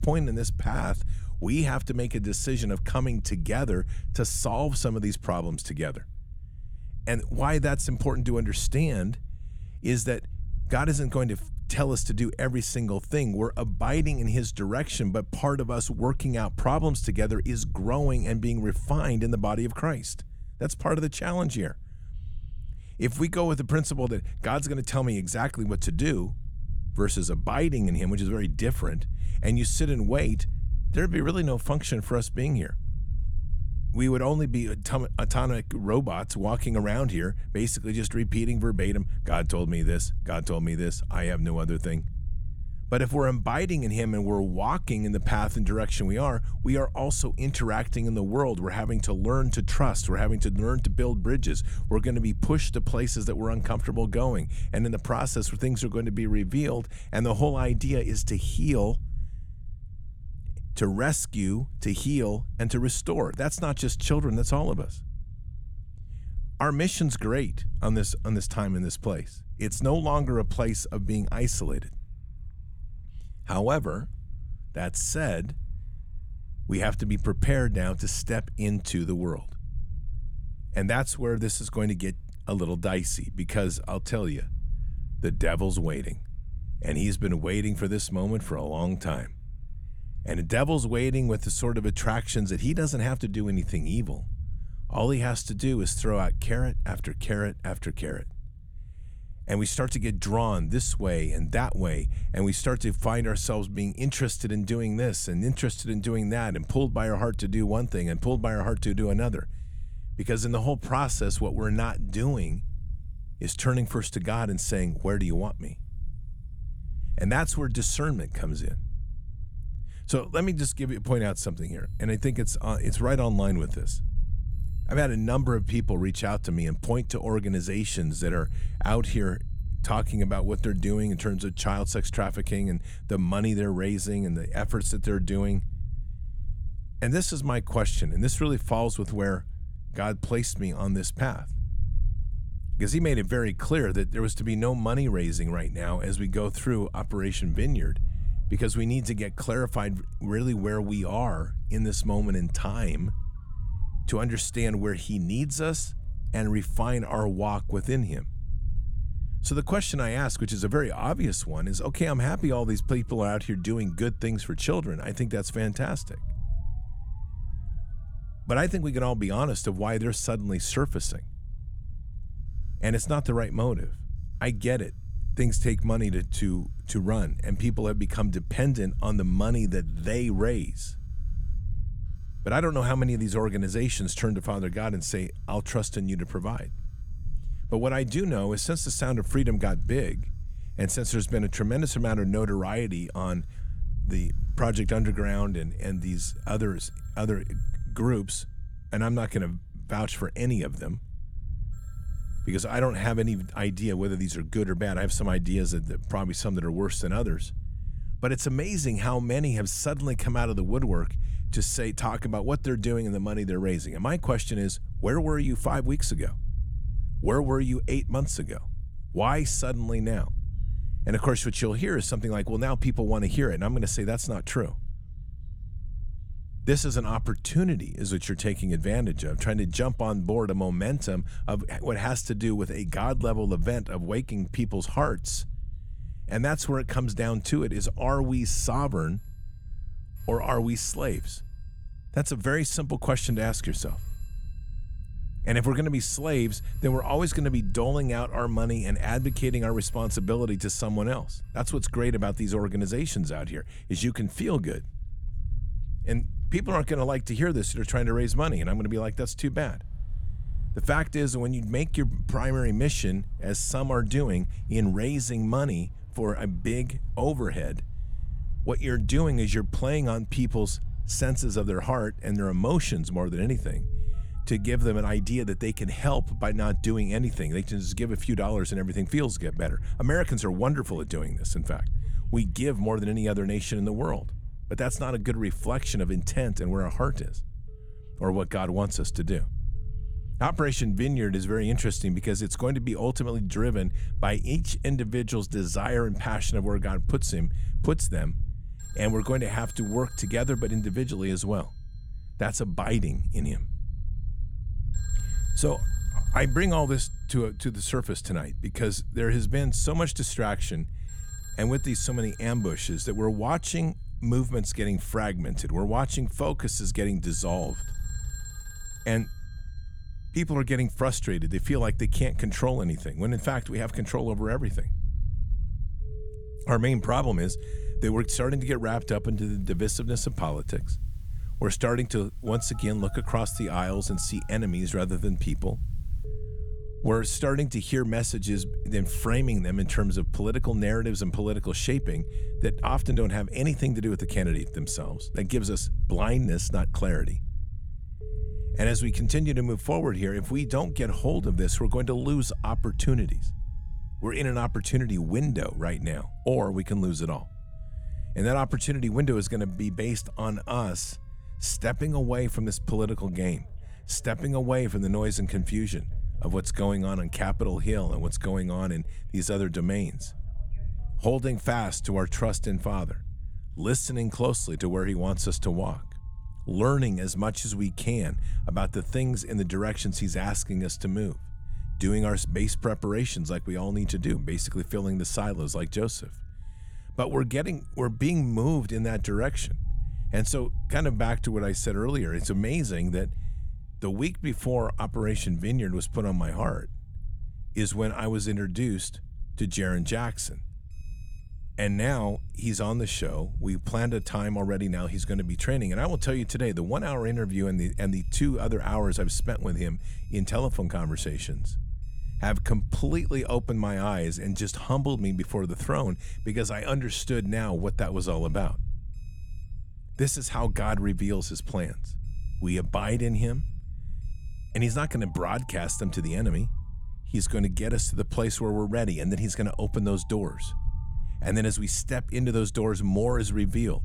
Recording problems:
alarms or sirens; faint; throughout; 25 dB below the speech
low rumble; faint; throughout; 25 dB below the speech

